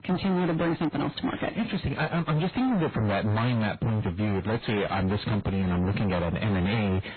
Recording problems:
distortion; heavy; 33% of the sound clipped
garbled, watery; badly; nothing above 4 kHz

